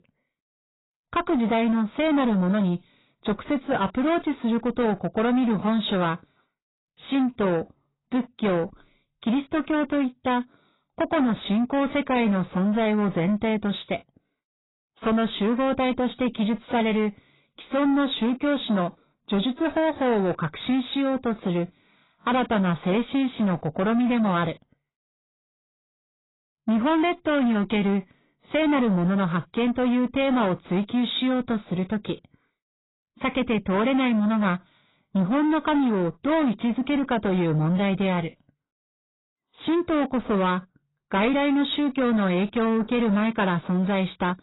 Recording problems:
garbled, watery; badly; nothing above 4 kHz
distortion; slight; 9 dB below the speech

